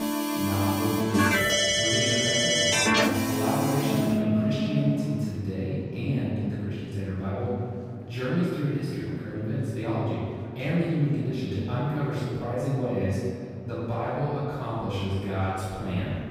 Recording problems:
room echo; strong; dies away in 2.1 s
off-mic speech; far
background music; very loud; until 5 s; 5 dB above the speech
chatter from many people; faint; throughout; 20 dB below the speech

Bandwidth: 15.5 kHz